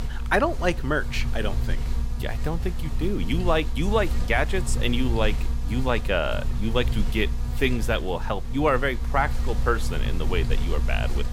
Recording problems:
electrical hum; very faint; throughout; 50 Hz, 15 dB below the speech

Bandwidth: 16 kHz